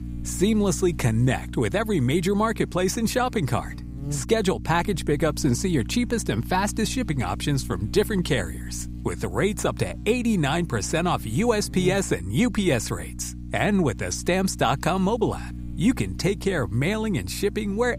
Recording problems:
electrical hum; noticeable; throughout; 60 Hz, 20 dB below the speech

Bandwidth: 15.5 kHz